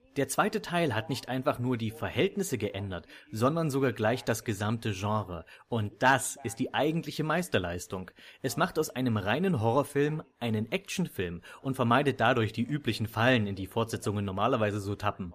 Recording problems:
voice in the background; faint; throughout; 30 dB below the speech

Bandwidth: 15 kHz